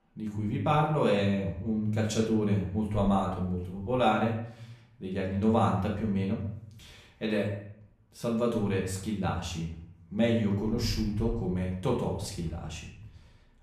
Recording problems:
off-mic speech; far
room echo; noticeable; dies away in 0.6 s

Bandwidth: 14.5 kHz